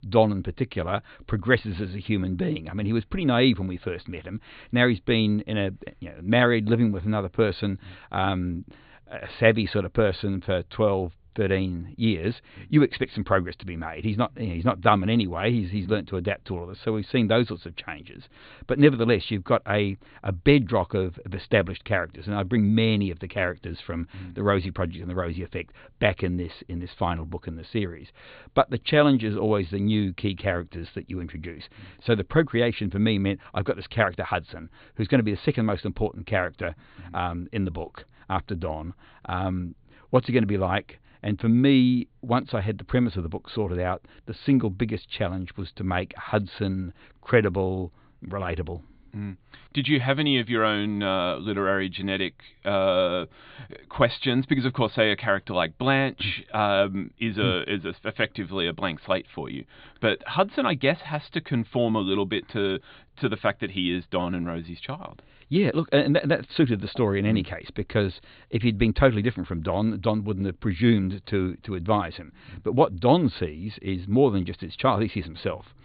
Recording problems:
high frequencies cut off; severe; nothing above 4 kHz

